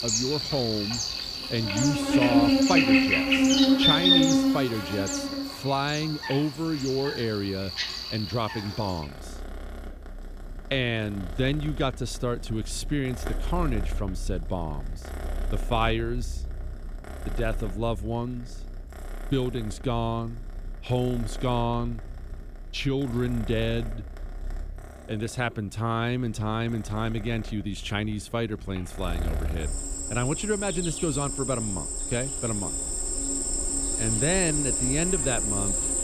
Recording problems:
animal sounds; very loud; throughout; 3 dB above the speech

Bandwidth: 15 kHz